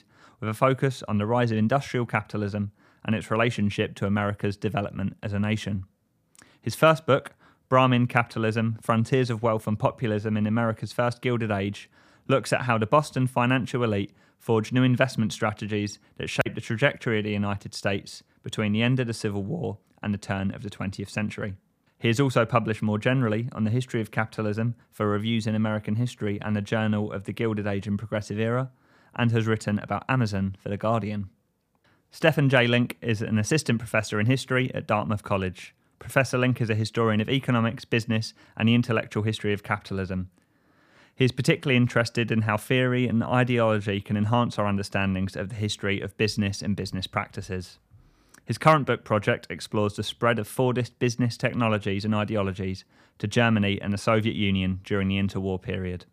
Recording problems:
none

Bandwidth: 15 kHz